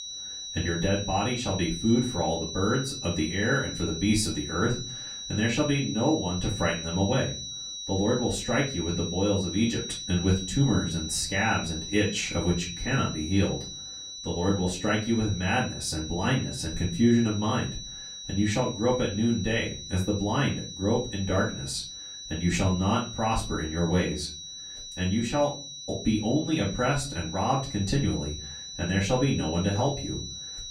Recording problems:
off-mic speech; far
room echo; slight; dies away in 0.3 s
high-pitched whine; loud; throughout; 4 kHz, 8 dB below the speech

